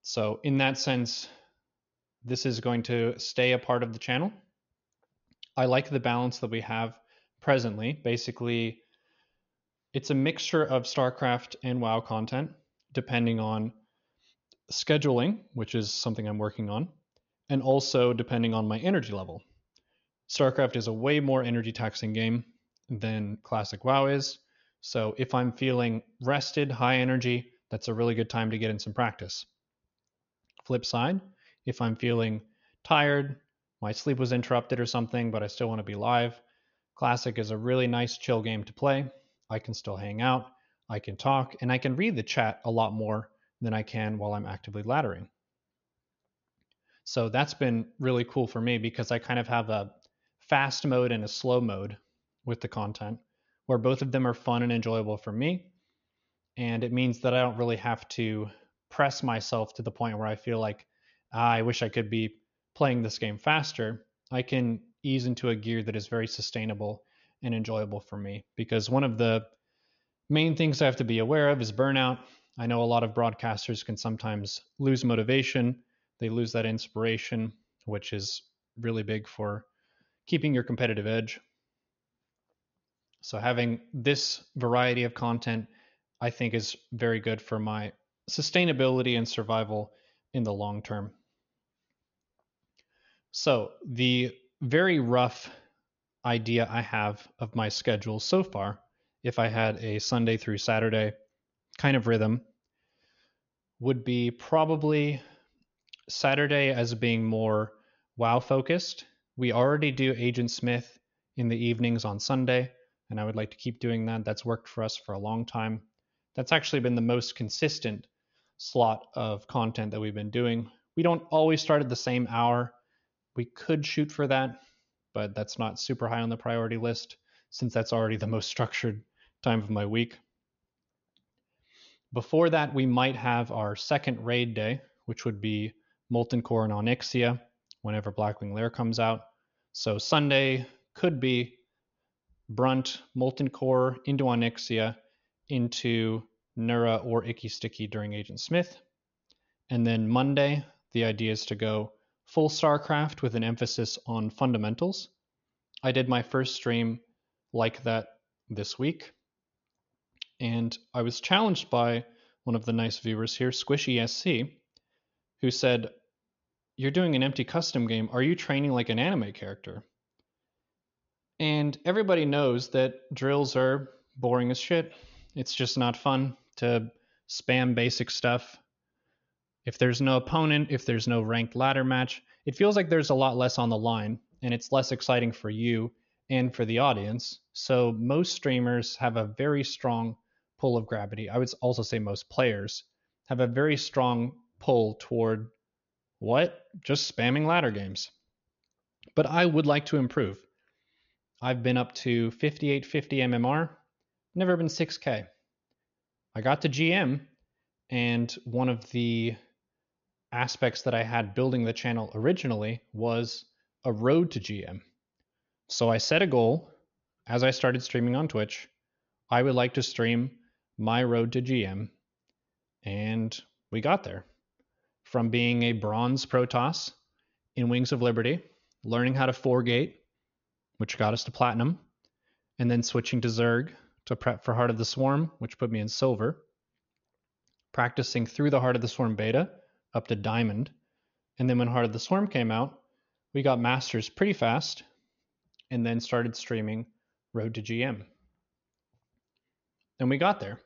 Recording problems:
high frequencies cut off; noticeable; nothing above 6.5 kHz

